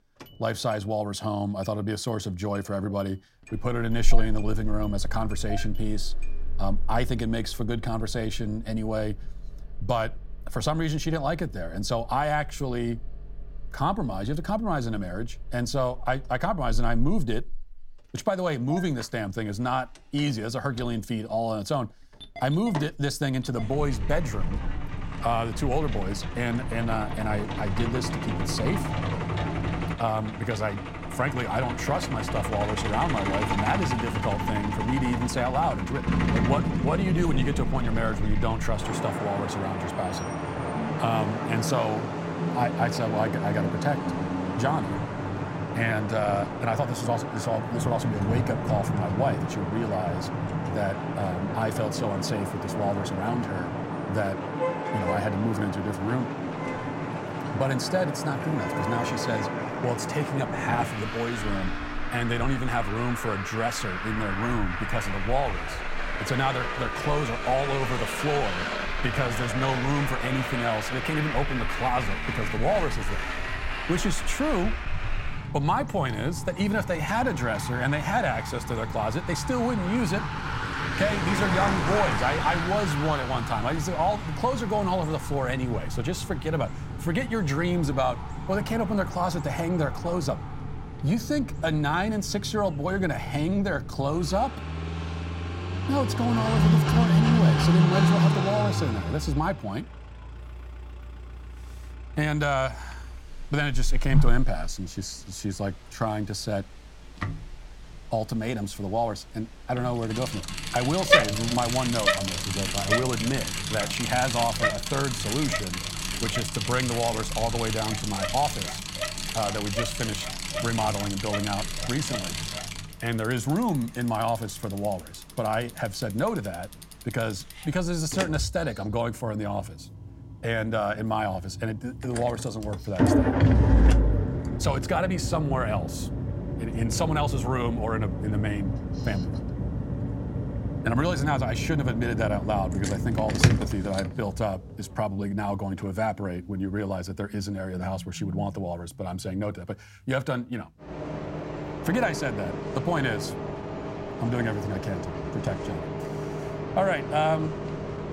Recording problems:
traffic noise; loud; throughout; 1 dB below the speech

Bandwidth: 16 kHz